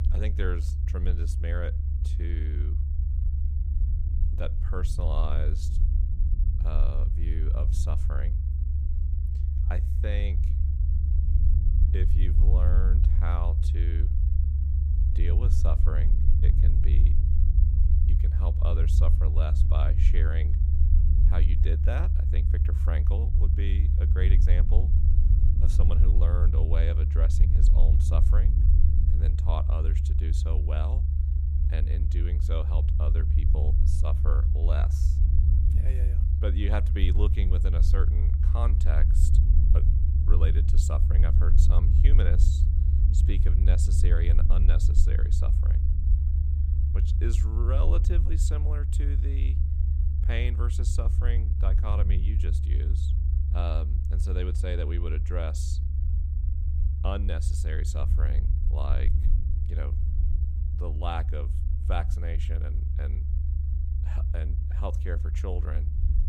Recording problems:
low rumble; loud; throughout; 3 dB below the speech

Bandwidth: 15.5 kHz